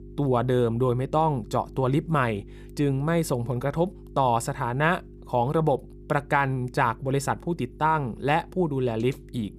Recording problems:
electrical hum; faint; throughout; 50 Hz, 25 dB below the speech

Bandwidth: 15 kHz